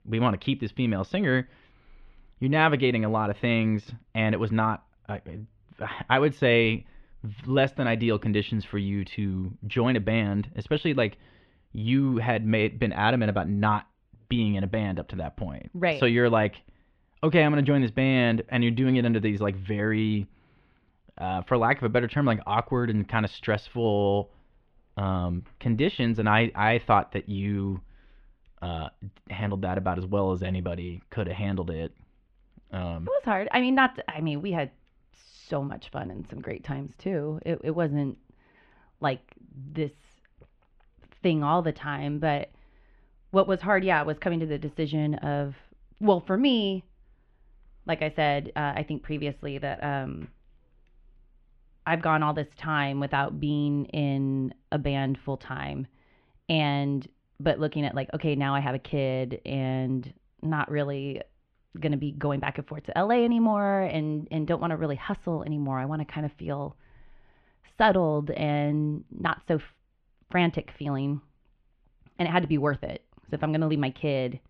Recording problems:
muffled; slightly; fading above 3 kHz

